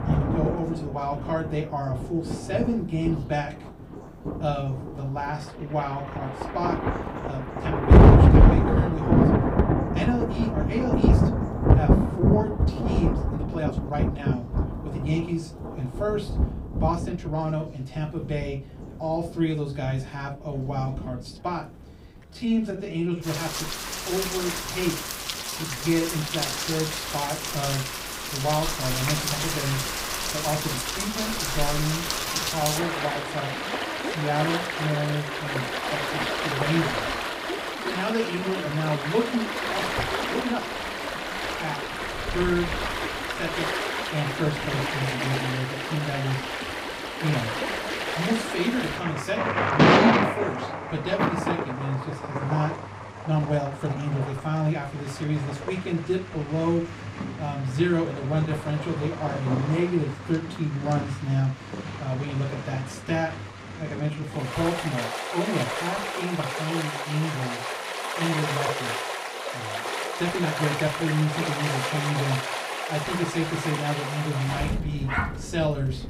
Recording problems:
off-mic speech; far
room echo; very slight; dies away in 0.2 s
rain or running water; very loud; throughout; 3 dB above the speech
background chatter; faint; throughout; 3 voices, 30 dB below the speech
uneven, jittery; strongly; from 7.5 s to 1:11

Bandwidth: 15.5 kHz